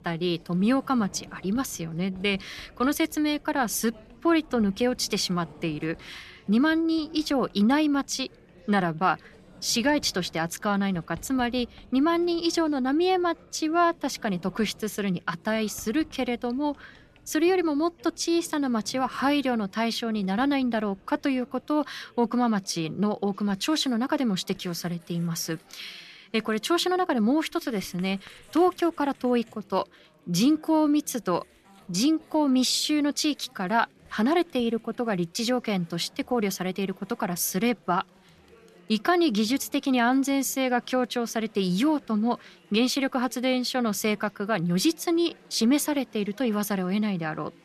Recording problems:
household noises; faint; throughout; 25 dB below the speech
chatter from many people; faint; throughout; 30 dB below the speech

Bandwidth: 13.5 kHz